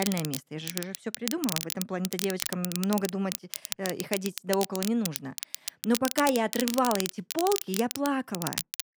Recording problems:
crackle, like an old record; loud; 4 dB below the speech
abrupt cut into speech; at the start

